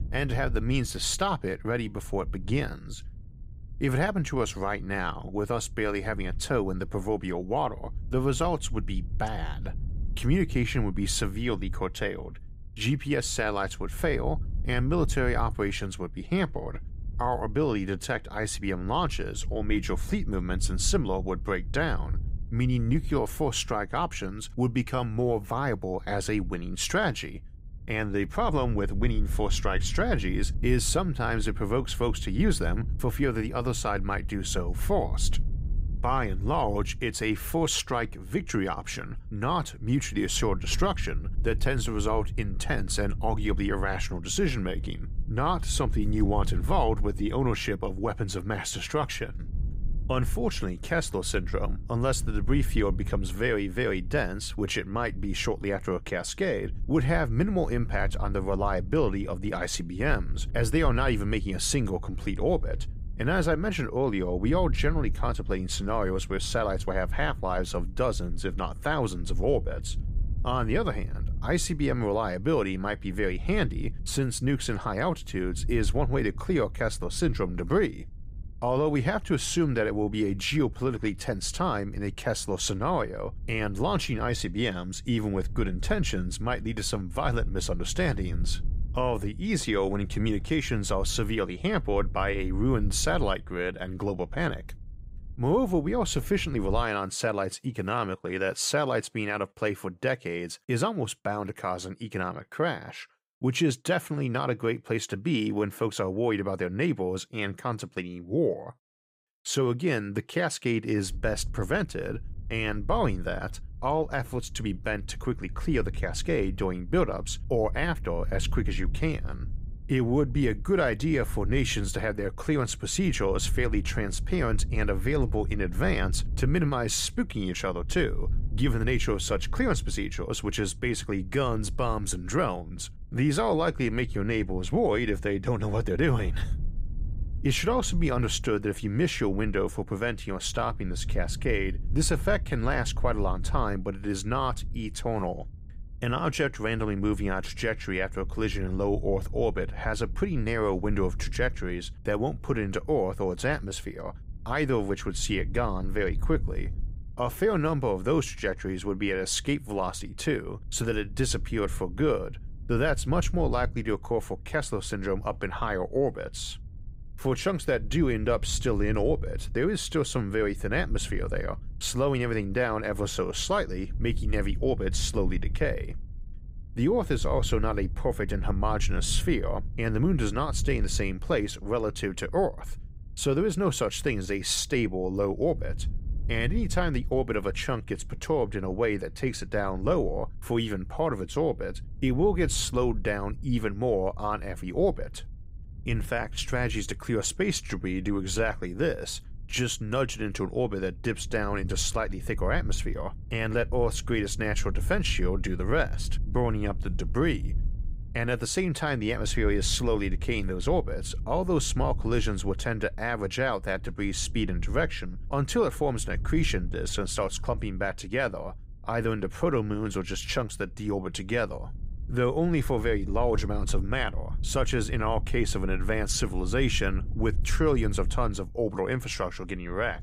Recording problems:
low rumble; faint; until 1:37 and from 1:51 on; 25 dB below the speech

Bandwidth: 15.5 kHz